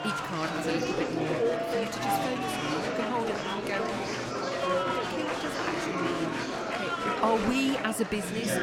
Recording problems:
chatter from many people; very loud; throughout; 2 dB above the speech

